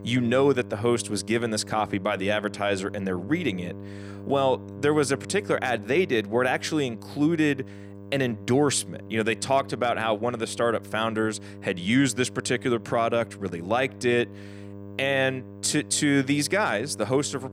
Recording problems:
electrical hum; faint; throughout; 50 Hz, 20 dB below the speech

